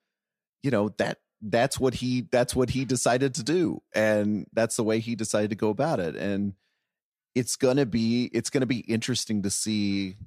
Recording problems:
none

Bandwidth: 14.5 kHz